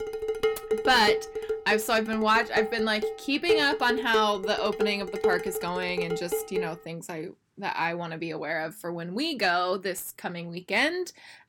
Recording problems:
distortion; slight; 10 dB below the speech
clattering dishes; loud; until 6.5 s; peak 1 dB above the speech

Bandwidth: 18.5 kHz